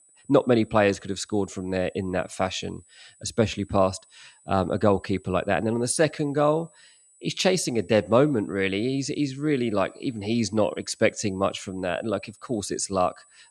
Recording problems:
high-pitched whine; faint; throughout; 8 kHz, 30 dB below the speech

